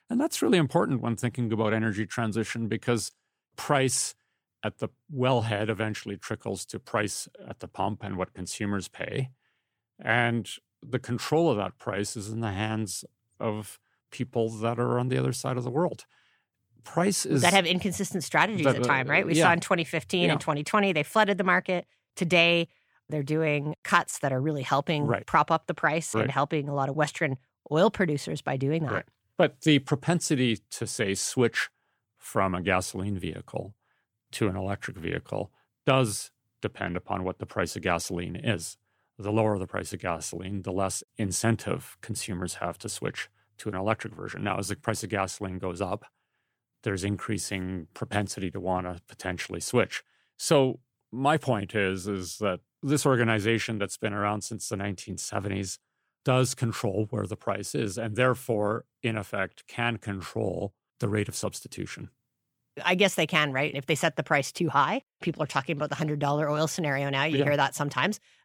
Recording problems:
none

